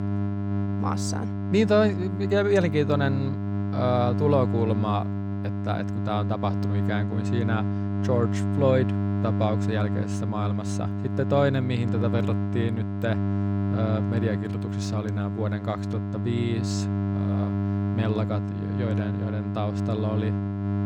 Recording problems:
electrical hum; loud; throughout; 50 Hz, 6 dB below the speech

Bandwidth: 17.5 kHz